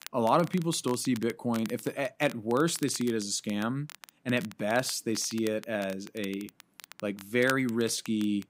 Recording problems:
crackle, like an old record; noticeable; 15 dB below the speech

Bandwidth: 15.5 kHz